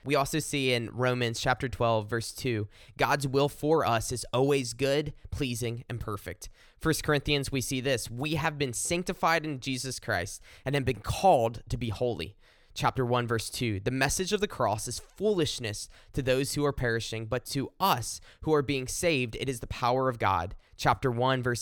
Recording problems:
abrupt cut into speech; at the end

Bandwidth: 18 kHz